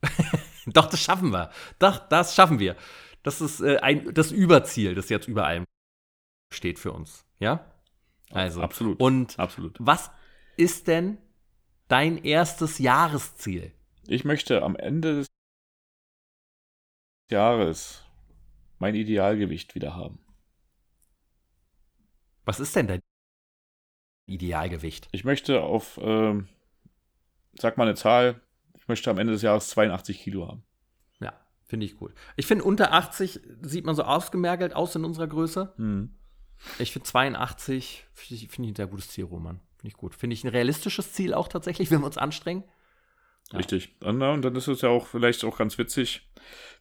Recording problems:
audio cutting out; at 5.5 s for 1 s, at 15 s for 2 s and at 23 s for 1.5 s

